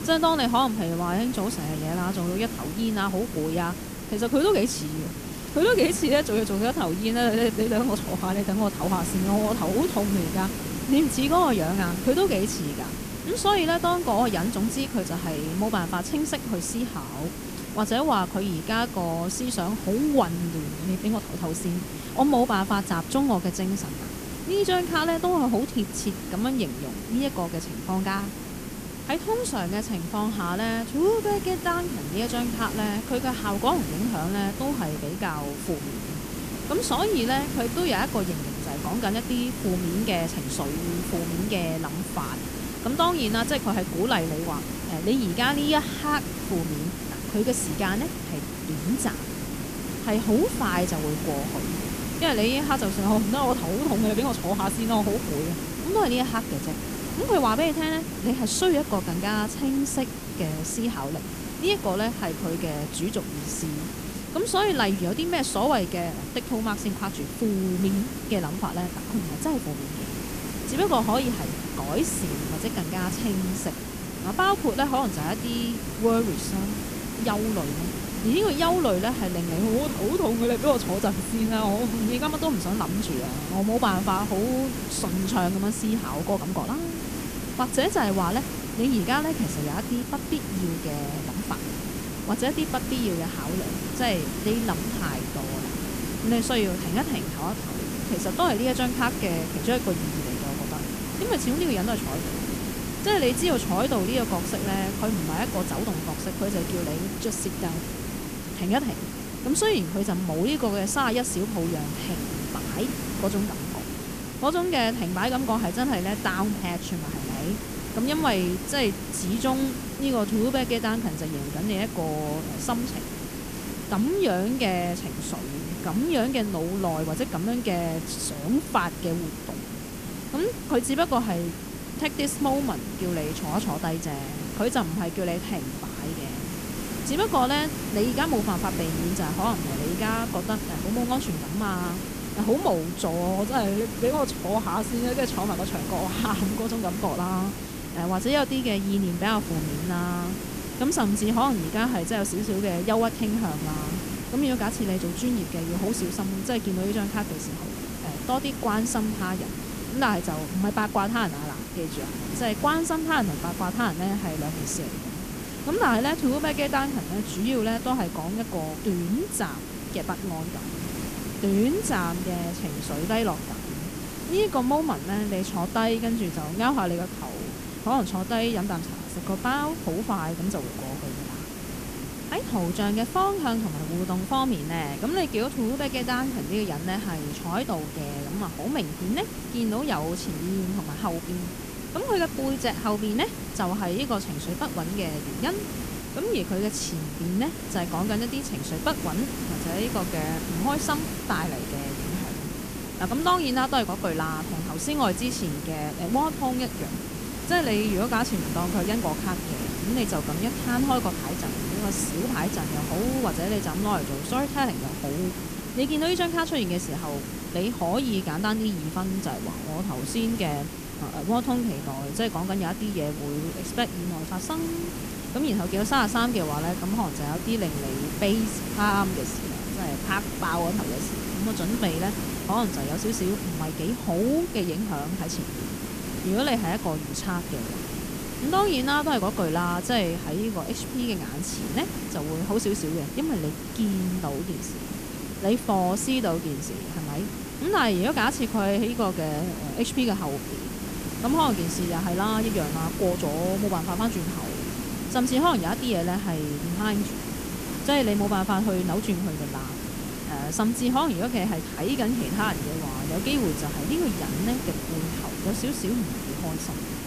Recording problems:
hiss; loud; throughout; 6 dB below the speech
background chatter; faint; throughout; 2 voices, 30 dB below the speech

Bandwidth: 14.5 kHz